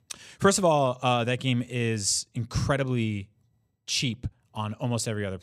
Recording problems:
none

